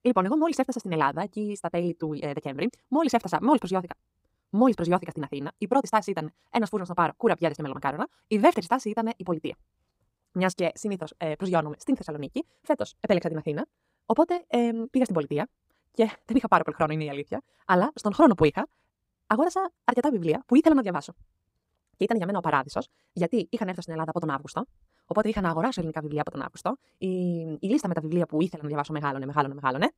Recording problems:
wrong speed, natural pitch; too fast; 1.7 times normal speed

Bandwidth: 15.5 kHz